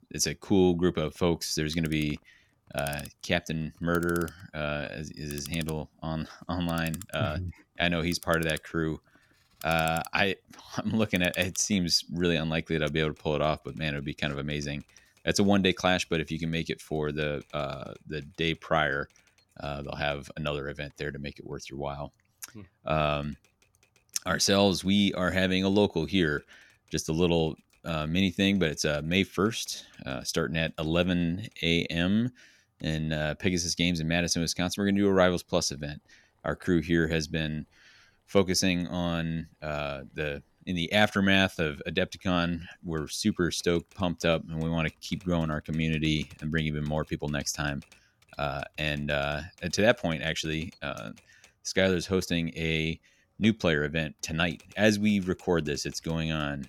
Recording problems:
household noises; faint; throughout; 20 dB below the speech

